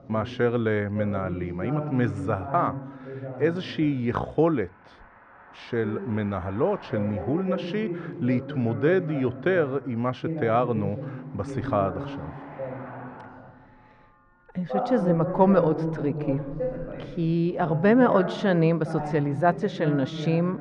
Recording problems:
muffled; very; fading above 1.5 kHz
voice in the background; loud; throughout; 8 dB below the speech
traffic noise; faint; throughout; 25 dB below the speech

